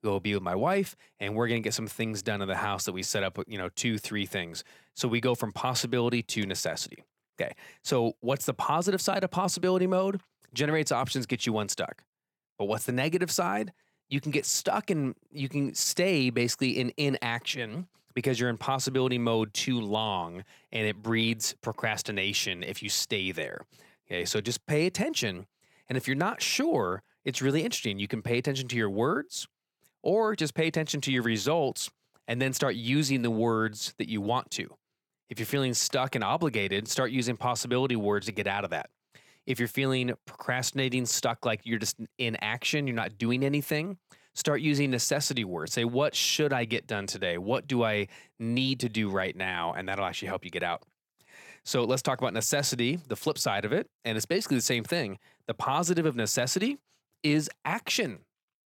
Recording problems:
none

